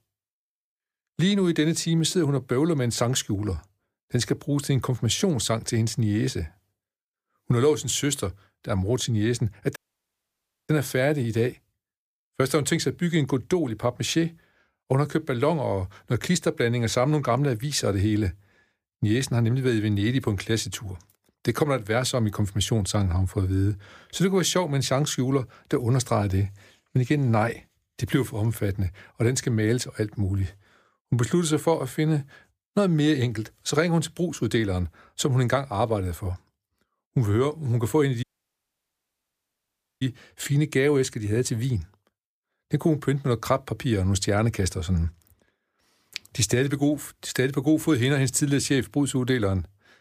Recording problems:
audio cutting out; at 10 s for 1 s and at 38 s for 2 s

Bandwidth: 15 kHz